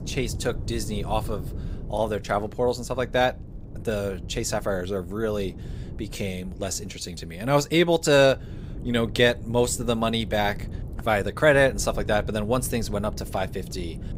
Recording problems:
wind noise on the microphone; occasional gusts; 25 dB below the speech

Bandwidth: 15.5 kHz